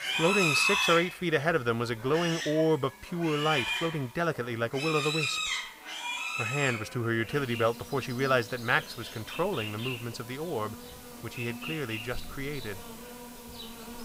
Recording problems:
animal sounds; loud; throughout; 2 dB below the speech
background chatter; faint; throughout; 2 voices, 25 dB below the speech
hiss; faint; throughout; 25 dB below the speech

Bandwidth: 15.5 kHz